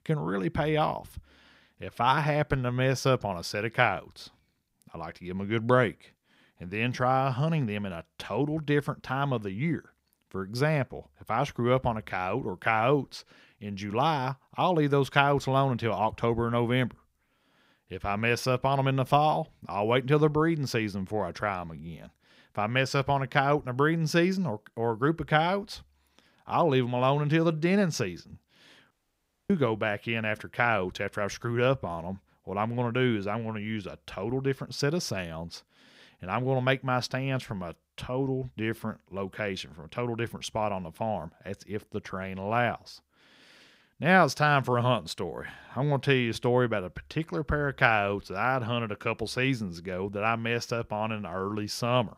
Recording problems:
audio cutting out; at 29 s for 0.5 s

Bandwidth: 15.5 kHz